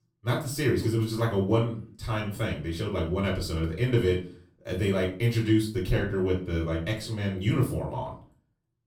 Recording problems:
off-mic speech; far
room echo; slight; dies away in 0.3 s

